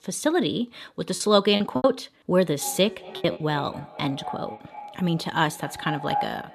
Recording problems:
echo of what is said; strong; from 2.5 s on; 230 ms later, 10 dB below the speech
choppy; very; at 1 s and at 3 s; 13% of the speech affected

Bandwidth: 13.5 kHz